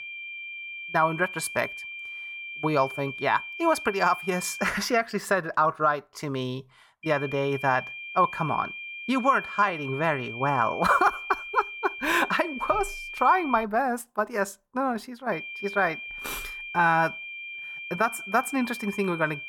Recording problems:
high-pitched whine; loud; until 4.5 s, from 7 to 14 s and from 15 s on; 2.5 kHz, 9 dB below the speech

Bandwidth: 18 kHz